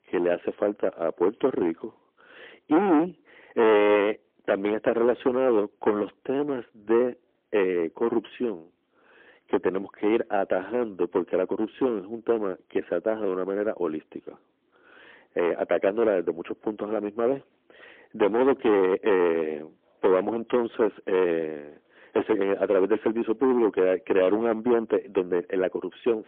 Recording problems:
phone-call audio; poor line; nothing above 3.5 kHz
distortion; heavy; 10% of the sound clipped

